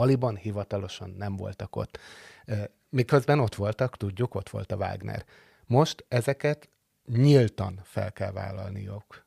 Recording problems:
abrupt cut into speech; at the start

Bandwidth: 15 kHz